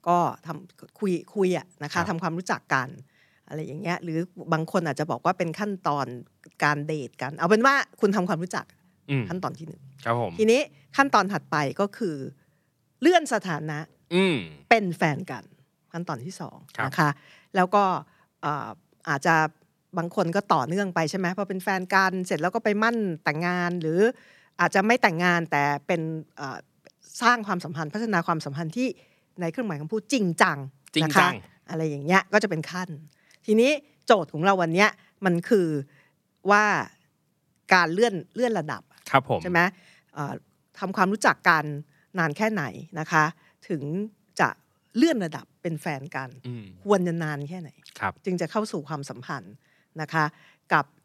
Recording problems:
none

